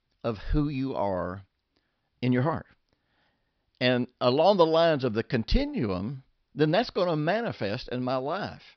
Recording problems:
high frequencies cut off; noticeable; nothing above 5.5 kHz

